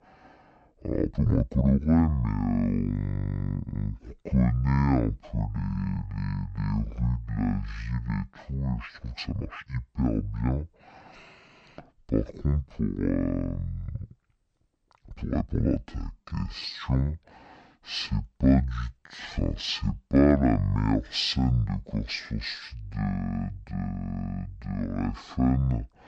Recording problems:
wrong speed and pitch; too slow and too low; 0.5 times normal speed
uneven, jittery; strongly; from 0.5 to 20 s

